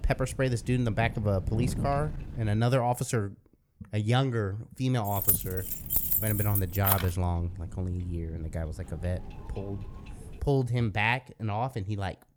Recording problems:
wind noise on the microphone; occasional gusts; until 2.5 s and from 5 to 10 s; 20 dB below the speech
jangling keys; loud; from 5 to 7 s; peak 6 dB above the speech

